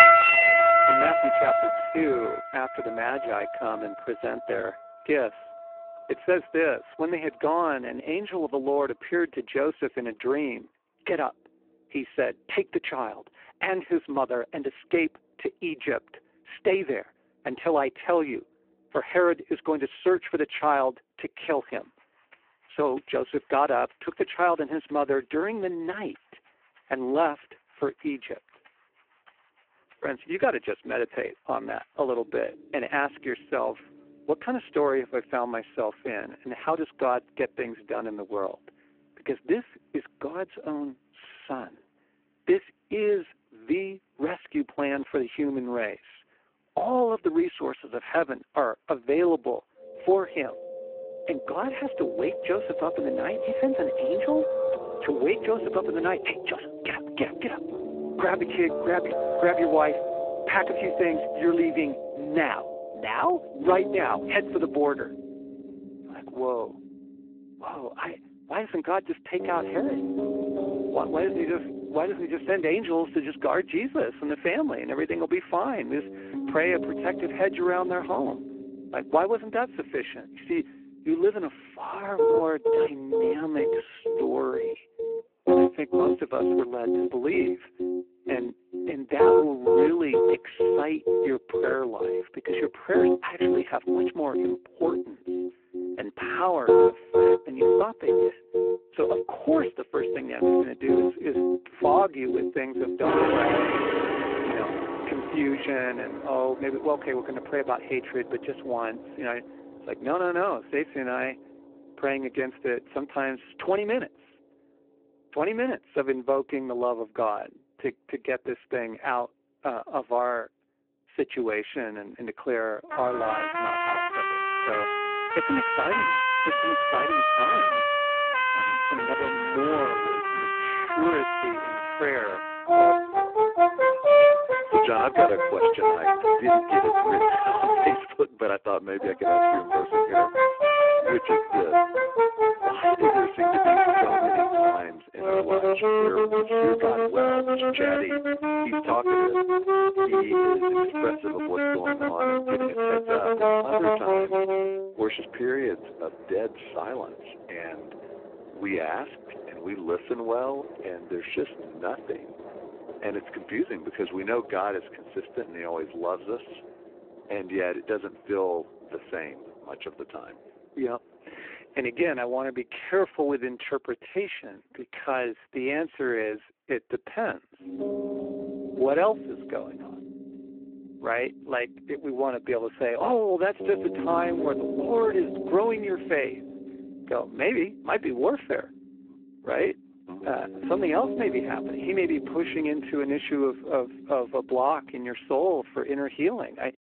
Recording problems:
phone-call audio; poor line
background music; very loud; throughout; 4 dB above the speech

